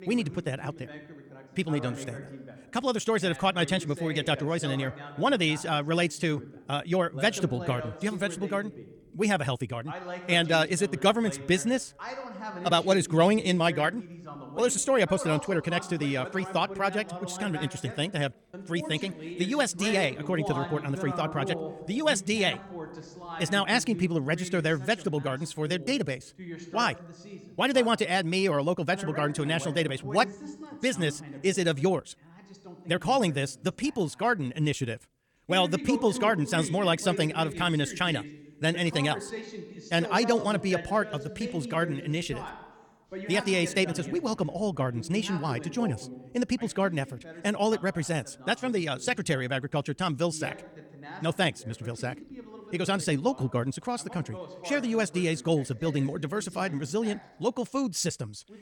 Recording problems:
wrong speed, natural pitch; too fast; 1.7 times normal speed
voice in the background; noticeable; throughout; 15 dB below the speech

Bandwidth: 18.5 kHz